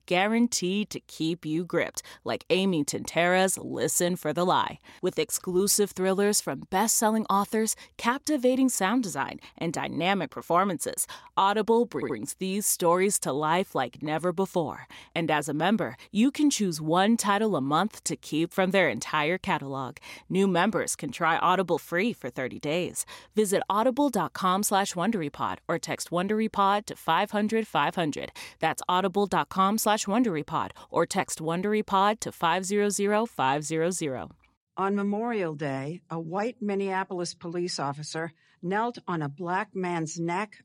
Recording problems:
audio stuttering; at 12 s

